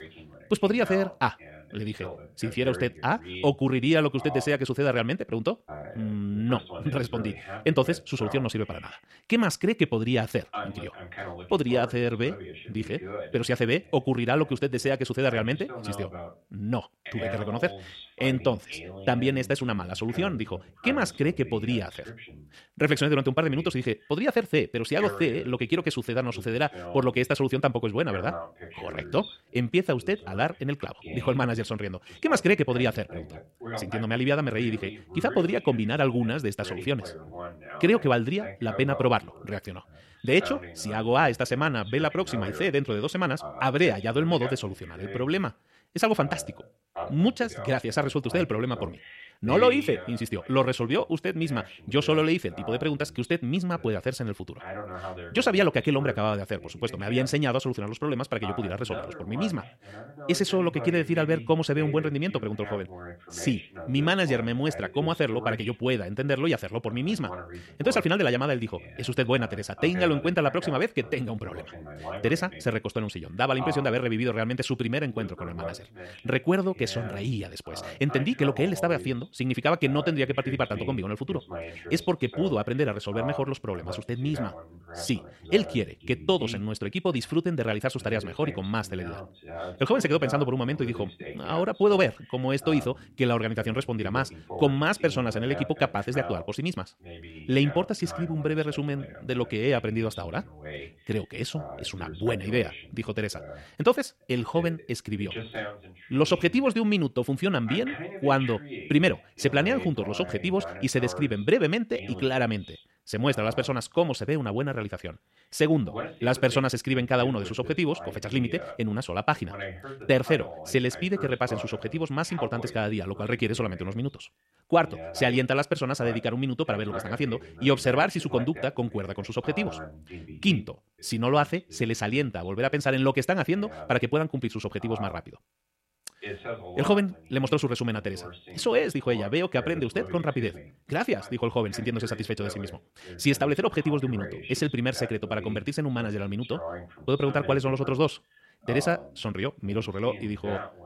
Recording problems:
wrong speed, natural pitch; too fast; 1.5 times normal speed
voice in the background; noticeable; throughout; 15 dB below the speech

